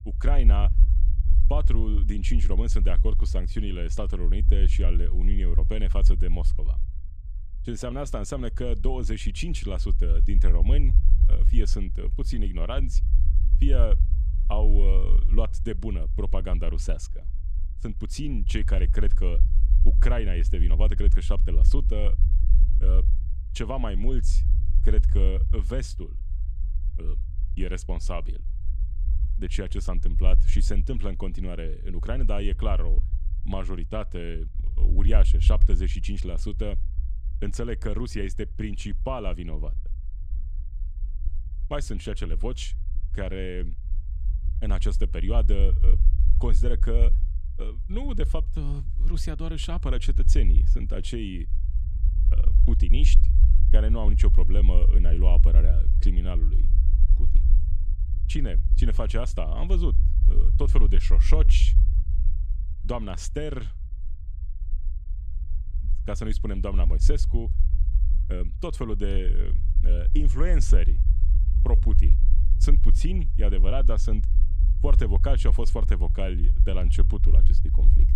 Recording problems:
low rumble; noticeable; throughout; 10 dB below the speech

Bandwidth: 14.5 kHz